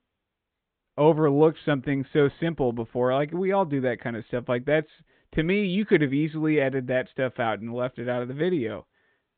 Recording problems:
high frequencies cut off; severe; nothing above 4 kHz

